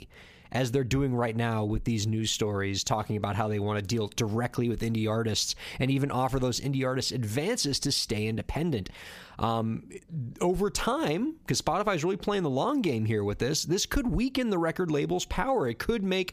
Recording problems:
squashed, flat; somewhat

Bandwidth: 15 kHz